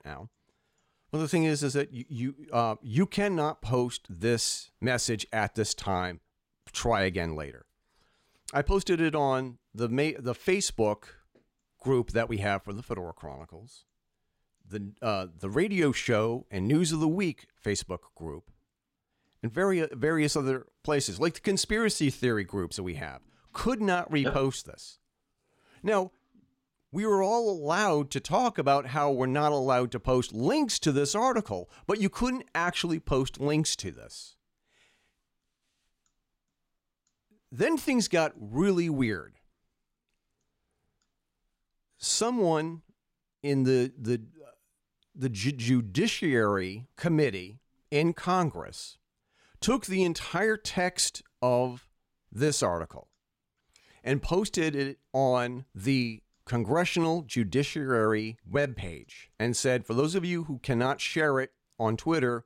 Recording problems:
none

